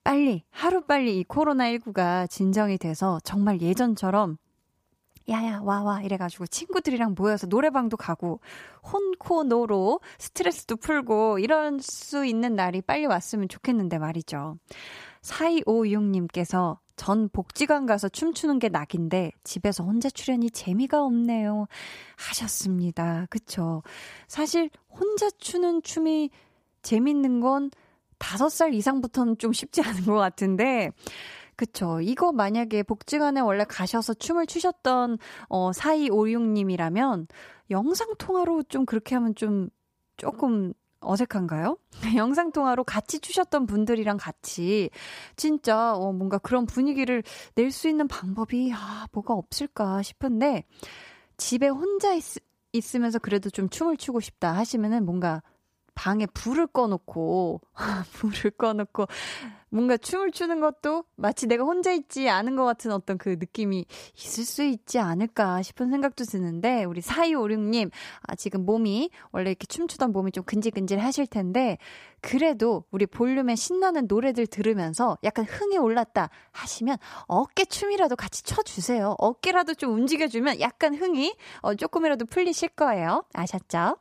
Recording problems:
none

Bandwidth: 15 kHz